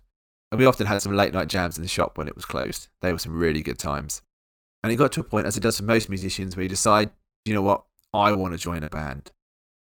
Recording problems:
choppy; very; 16% of the speech affected

